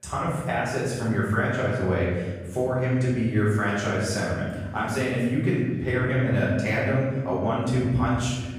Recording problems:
off-mic speech; far
room echo; noticeable; dies away in 1.6 s

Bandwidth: 15 kHz